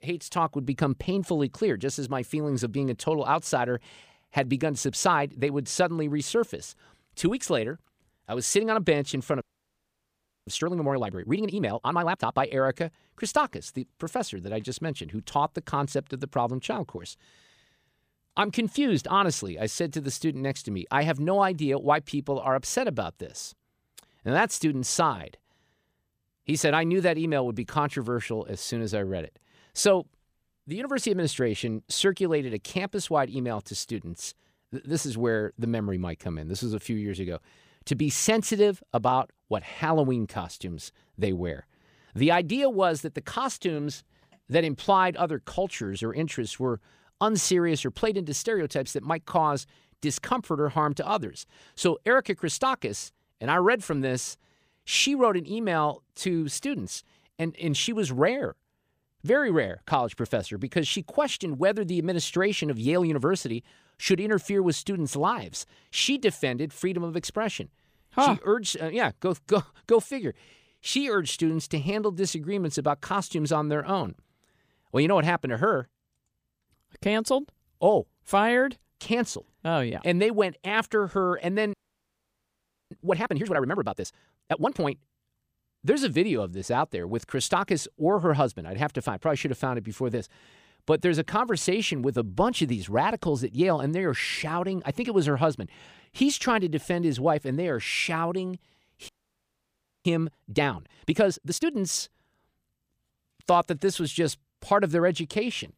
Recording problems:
audio freezing; at 9.5 s for 1 s, at 1:22 for 1 s and at 1:39 for 1 s

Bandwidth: 15 kHz